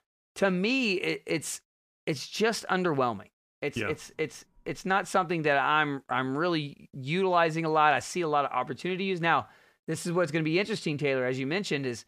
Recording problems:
none

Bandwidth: 15 kHz